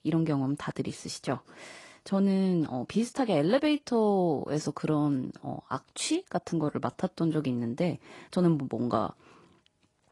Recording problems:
garbled, watery; slightly; nothing above 10.5 kHz

